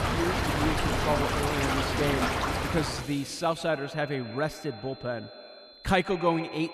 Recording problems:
echo of what is said; noticeable; throughout; 130 ms later, 15 dB below the speech
rain or running water; very loud; until 3 s; 2 dB above the speech
high-pitched whine; noticeable; throughout; 4 kHz, 20 dB below the speech

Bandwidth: 14 kHz